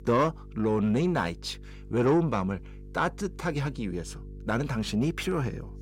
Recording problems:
distortion; slight; 10 dB below the speech
electrical hum; faint; throughout; 50 Hz, 25 dB below the speech

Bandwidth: 16 kHz